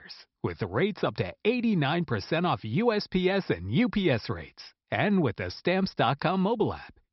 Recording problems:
high frequencies cut off; noticeable; nothing above 5.5 kHz

